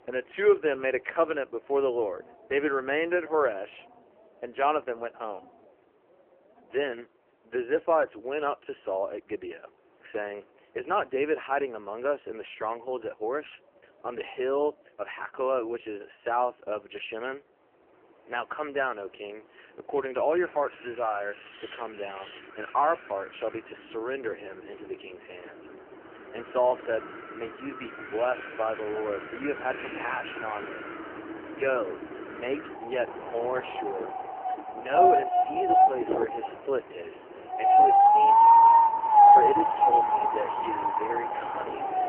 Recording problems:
phone-call audio; poor line; nothing above 3 kHz
wind in the background; very loud; throughout; 8 dB above the speech

